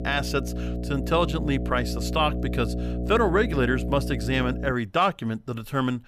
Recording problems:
electrical hum; noticeable; until 4.5 s; 60 Hz, 10 dB below the speech

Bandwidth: 14.5 kHz